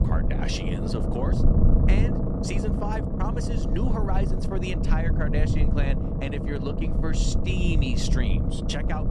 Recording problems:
low rumble; loud; throughout; 1 dB below the speech

